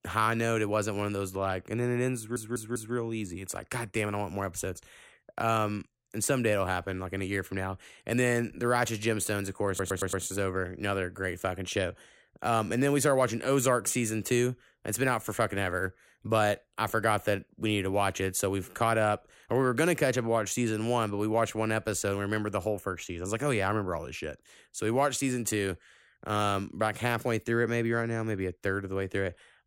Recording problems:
audio stuttering; at 2 s and at 9.5 s

